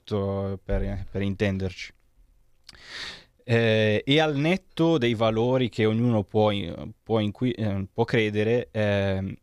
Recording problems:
none

